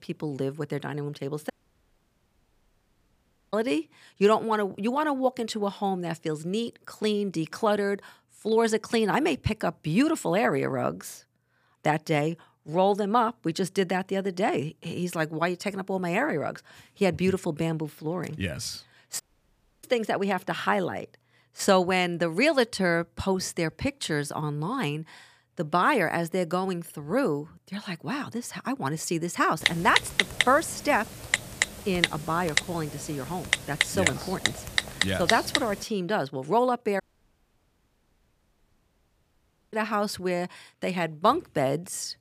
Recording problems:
audio cutting out; at 1.5 s for 2 s, at 19 s for 0.5 s and at 37 s for 2.5 s
keyboard typing; loud; from 30 to 36 s; peak 3 dB above the speech

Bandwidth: 15 kHz